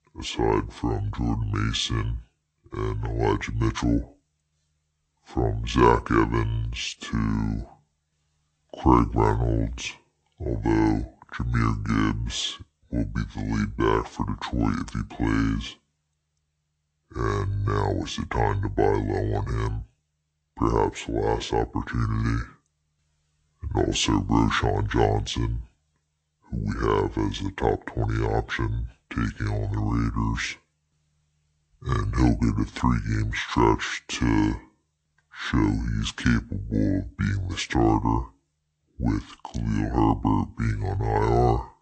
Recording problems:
wrong speed and pitch; too slow and too low; 0.6 times normal speed

